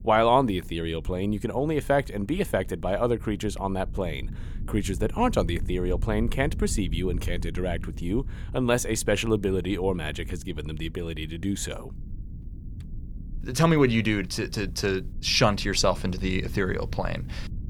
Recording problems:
low rumble; faint; throughout; 25 dB below the speech

